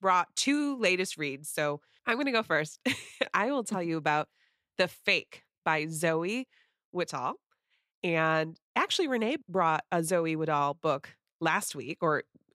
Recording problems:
none

